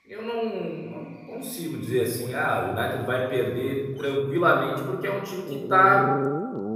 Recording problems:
room echo; noticeable; dies away in 1.8 s
off-mic speech; somewhat distant
animal sounds; loud; throughout; 4 dB below the speech

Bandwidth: 15 kHz